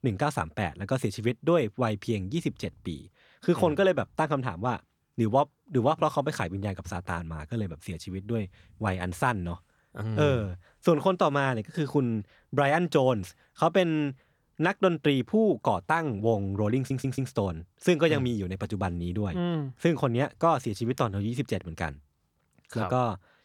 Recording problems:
audio stuttering; at 17 s

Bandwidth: 18.5 kHz